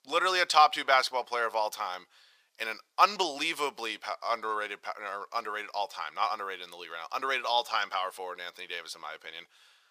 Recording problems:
thin; very; fading below 850 Hz

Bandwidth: 15 kHz